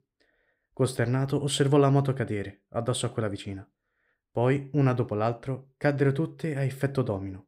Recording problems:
none

